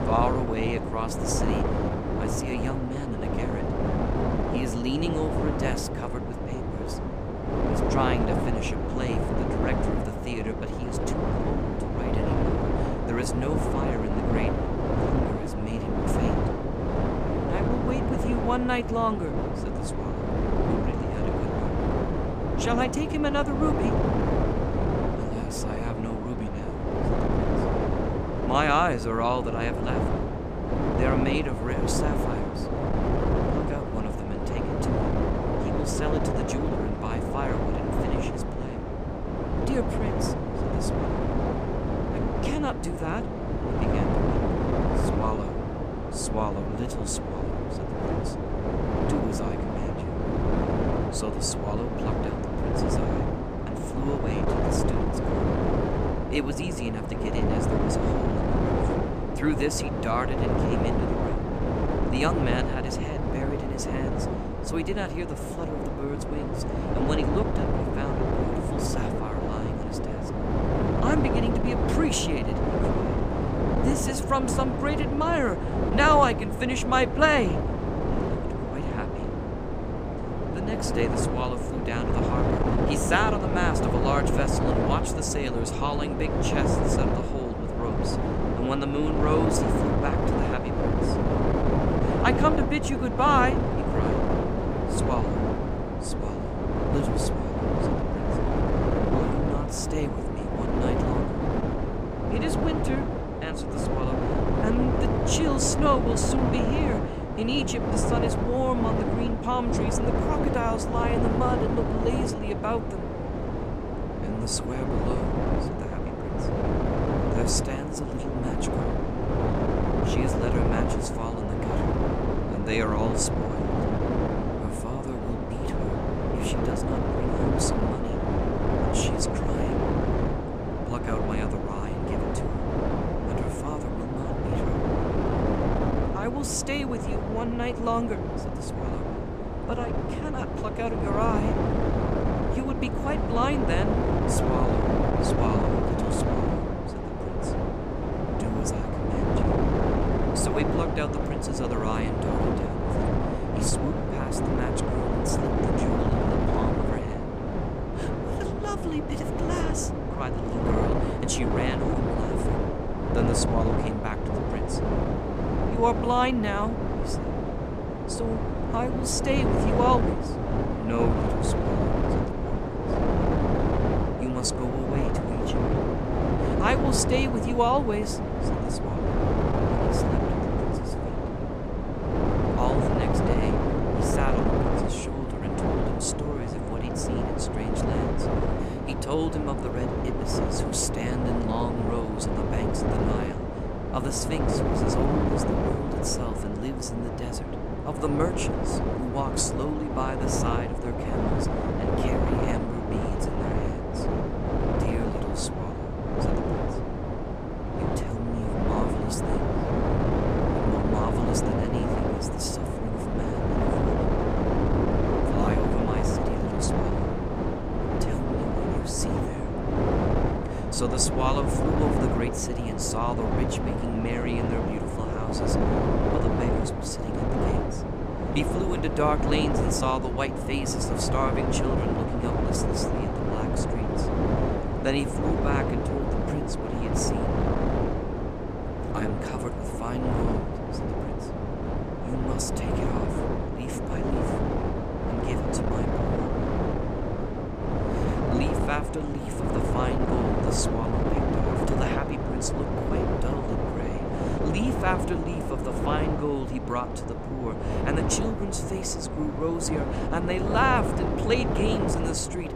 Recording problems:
wind noise on the microphone; heavy; 1 dB above the speech

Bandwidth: 15 kHz